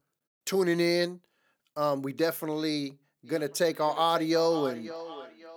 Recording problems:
echo of what is said; noticeable; from 3 s on; 540 ms later, 15 dB below the speech

